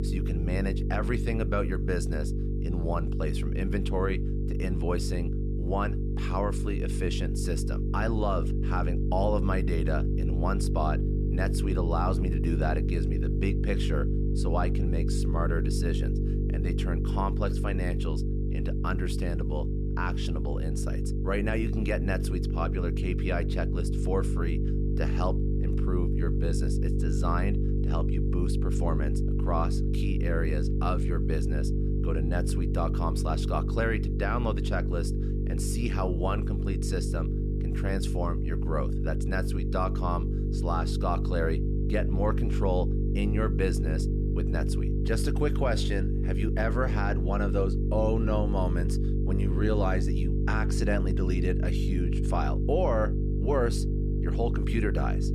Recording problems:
electrical hum; loud; throughout; 50 Hz, 5 dB below the speech

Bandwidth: 13.5 kHz